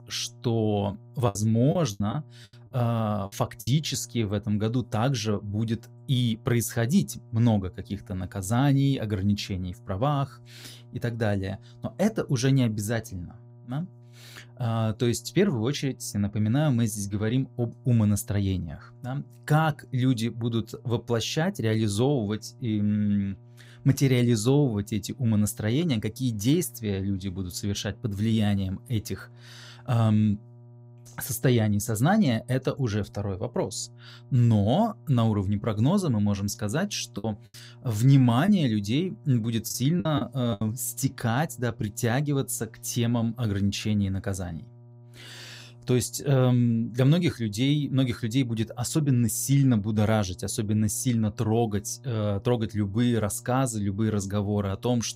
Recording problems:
electrical hum; faint; throughout; 60 Hz, 30 dB below the speech
choppy; very; from 1.5 to 3.5 s and from 37 to 41 s; 9% of the speech affected

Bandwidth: 15.5 kHz